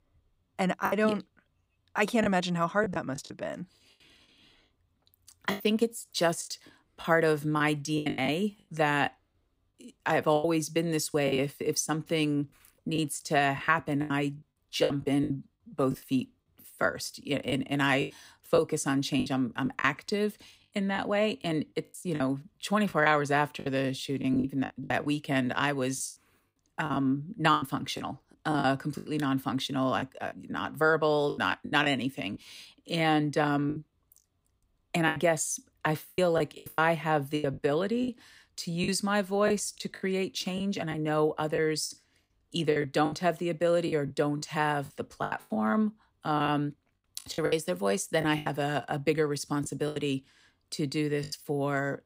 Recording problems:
choppy; very; 10% of the speech affected

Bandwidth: 15.5 kHz